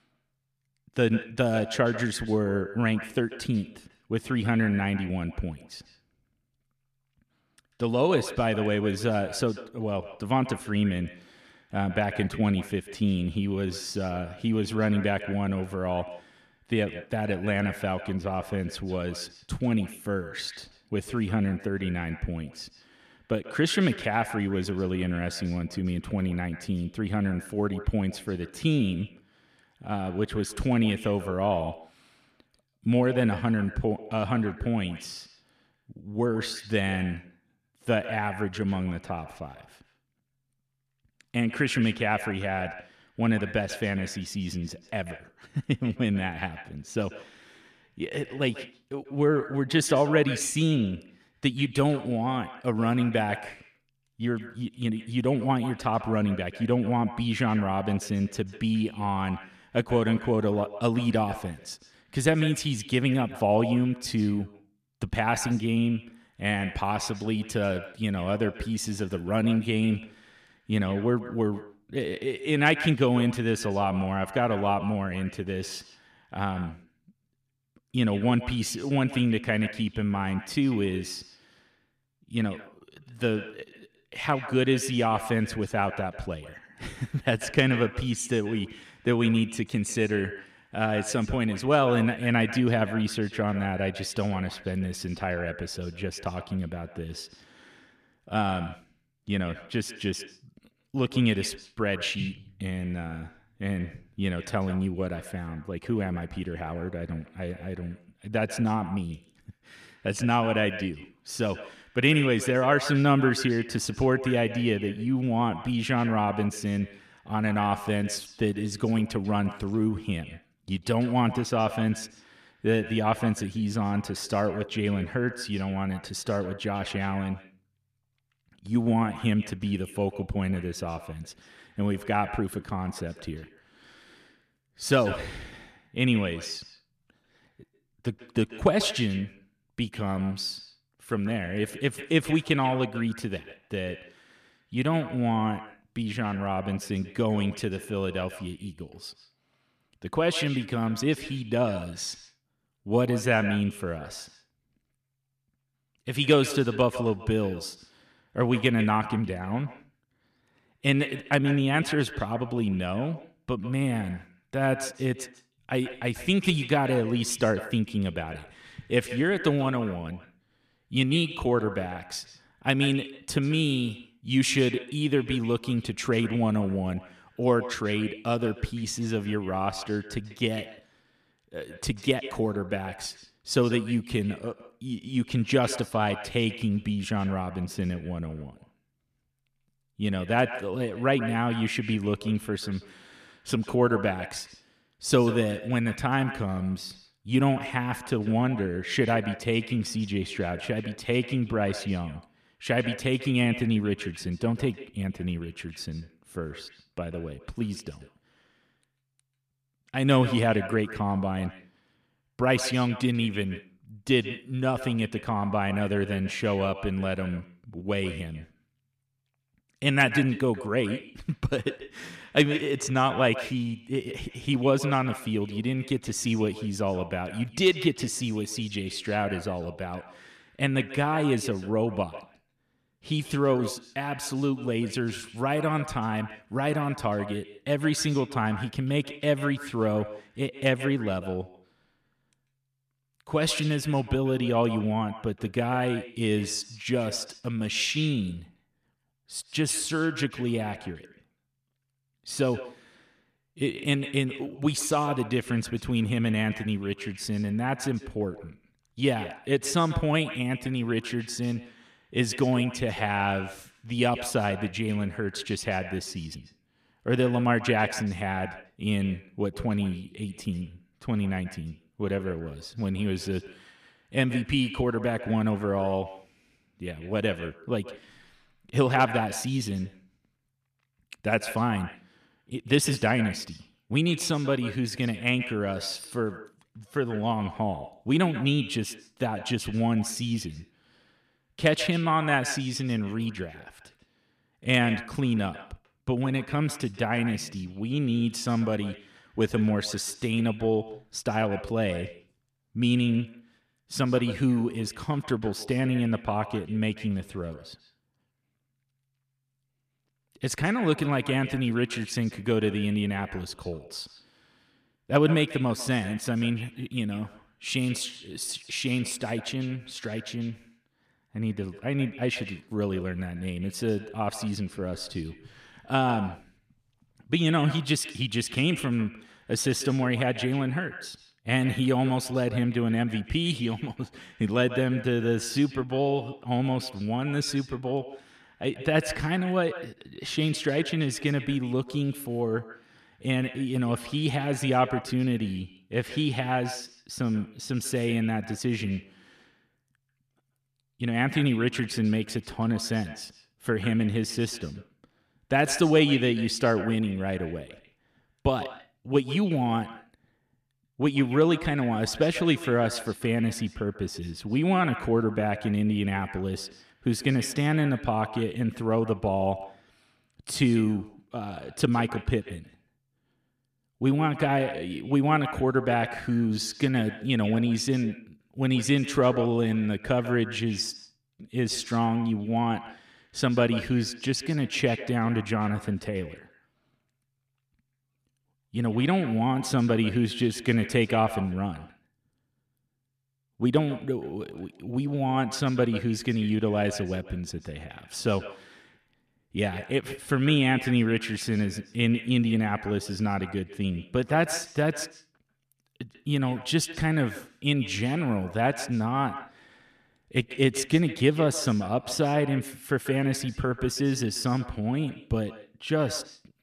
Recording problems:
echo of what is said; noticeable; throughout; 140 ms later, 15 dB below the speech

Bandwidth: 14.5 kHz